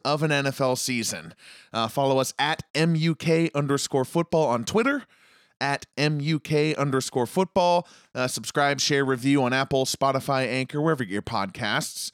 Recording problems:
none

